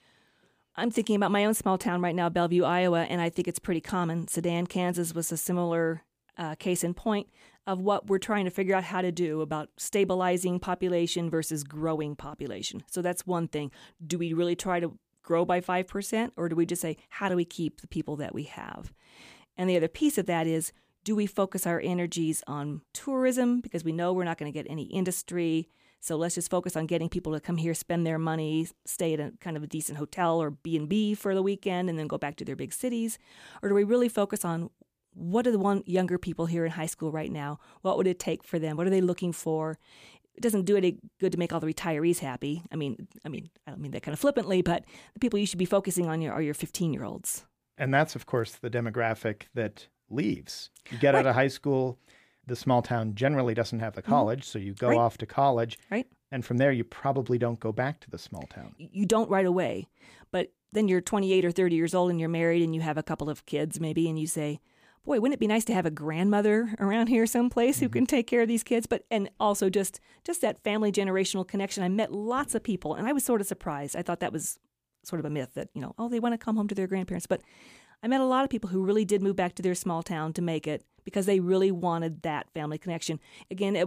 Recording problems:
abrupt cut into speech; at the end

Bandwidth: 15 kHz